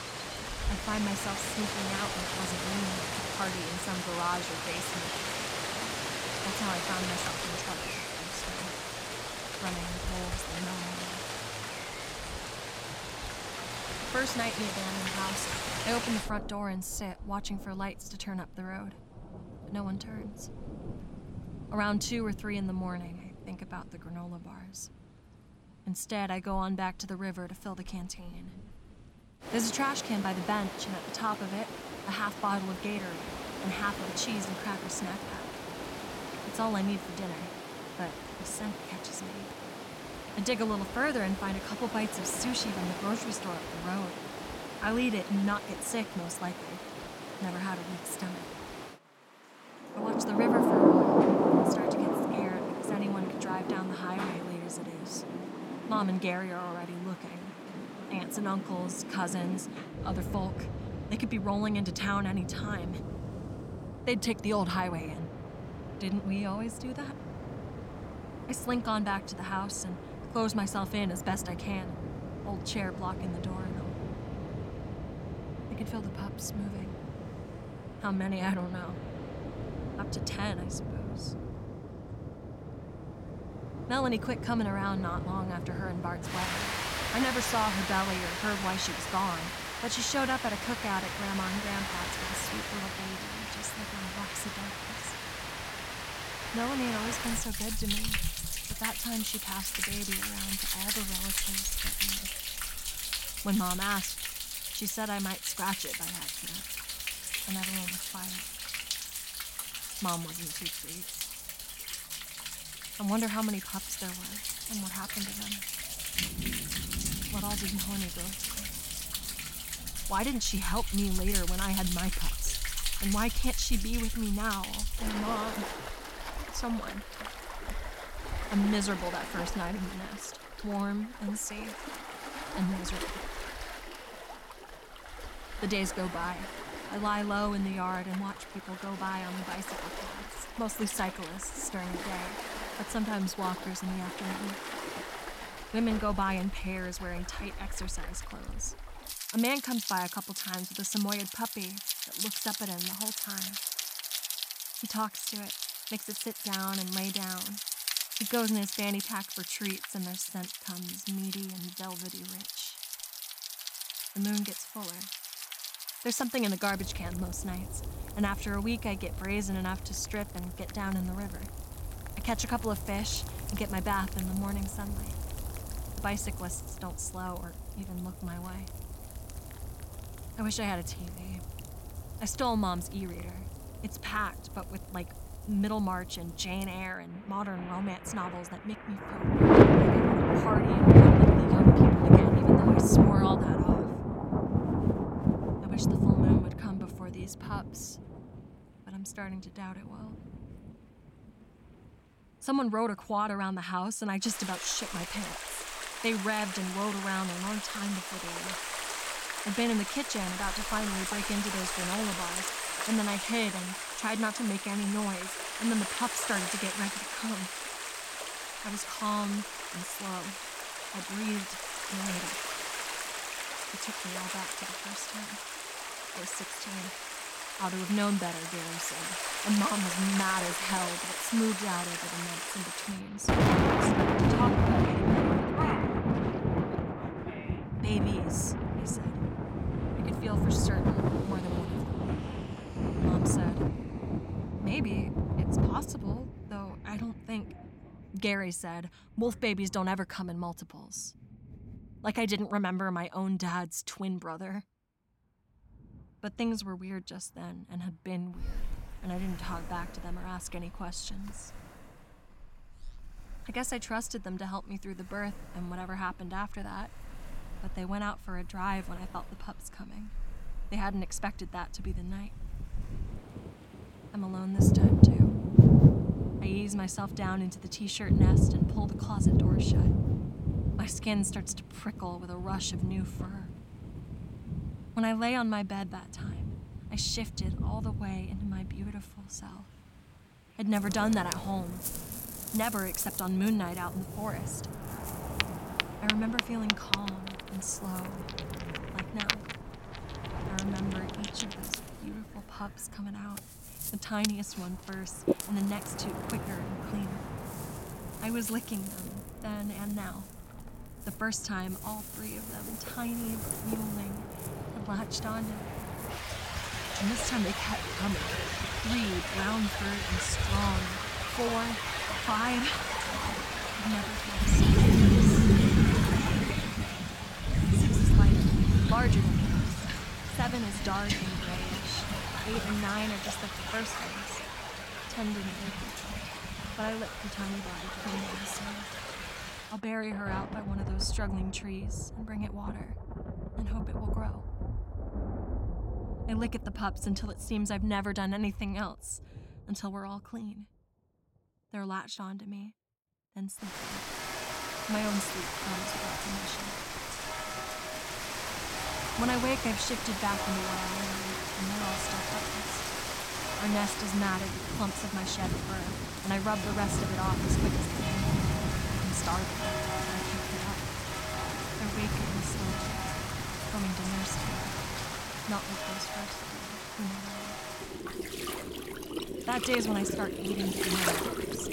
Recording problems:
rain or running water; very loud; throughout; 3 dB above the speech

